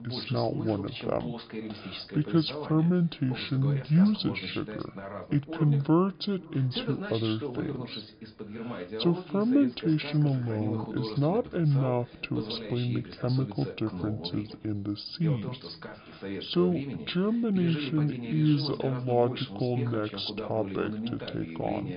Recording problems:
high frequencies cut off; severe; nothing above 5 kHz
wrong speed and pitch; too slow and too low; 0.6 times normal speed
echo of what is said; faint; throughout; 490 ms later, 25 dB below the speech
voice in the background; loud; throughout; 10 dB below the speech

